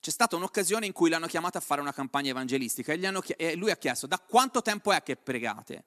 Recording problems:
none

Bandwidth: 13.5 kHz